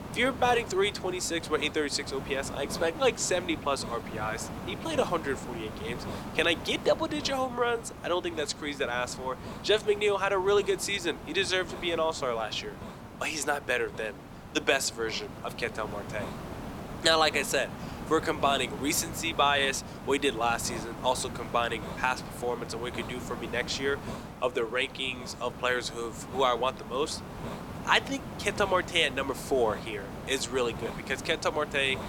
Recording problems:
thin; somewhat; fading below 400 Hz
hiss; noticeable; throughout; 10 dB below the speech

